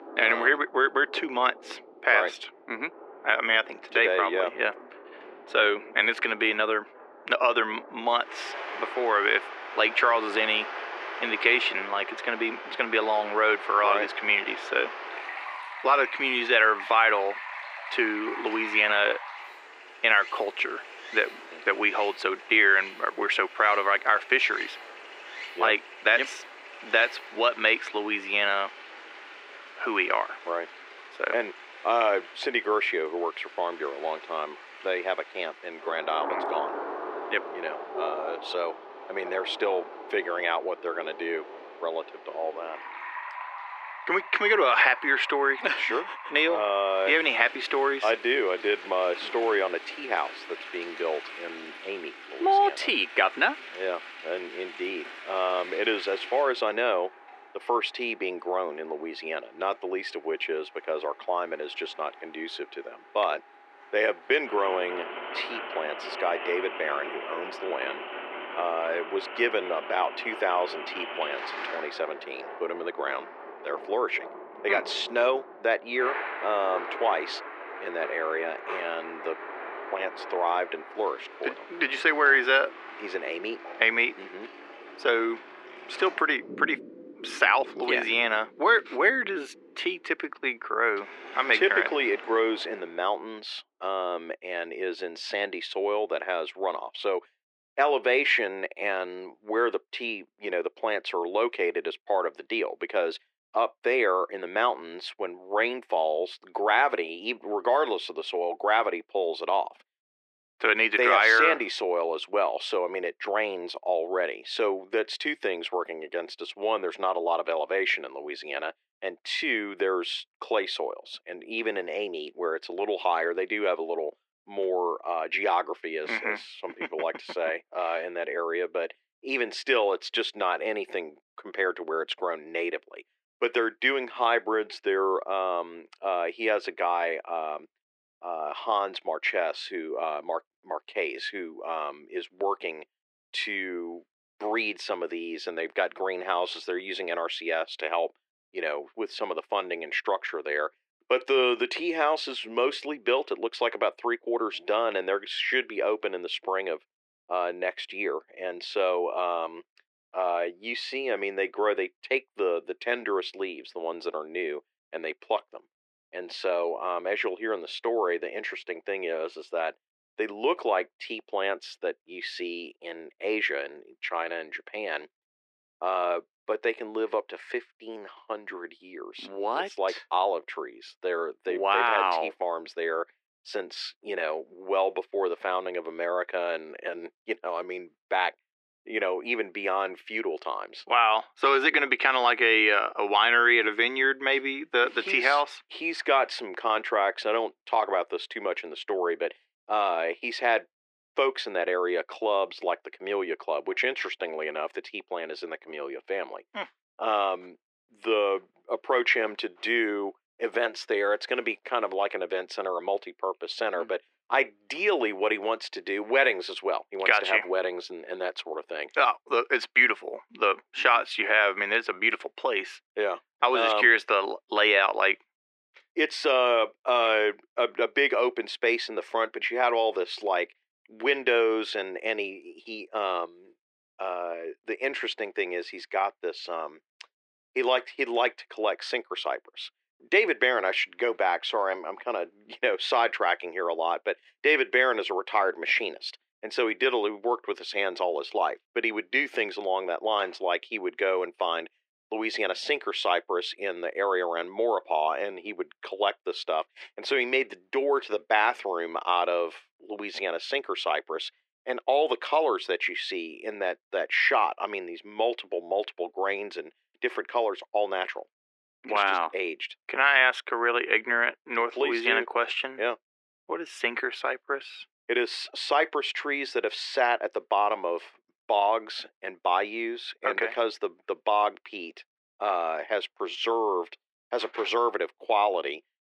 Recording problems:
thin; very; fading below 350 Hz
muffled; slightly; fading above 3 kHz
rain or running water; noticeable; until 1:33; 10 dB below the speech

